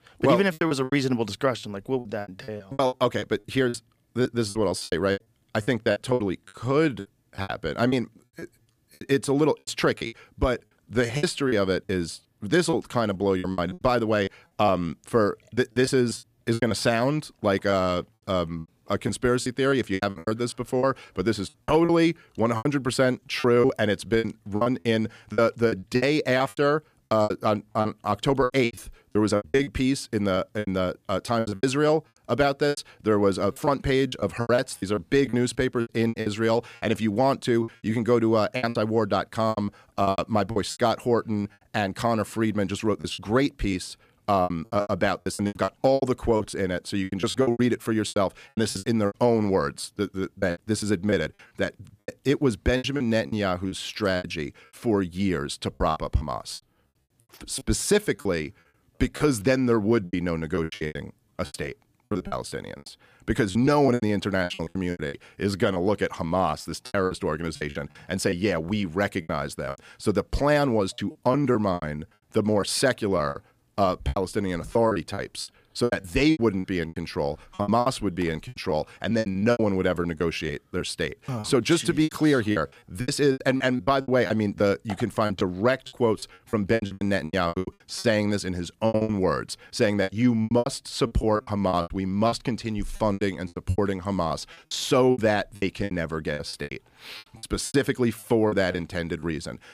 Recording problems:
choppy; very; 16% of the speech affected

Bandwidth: 15 kHz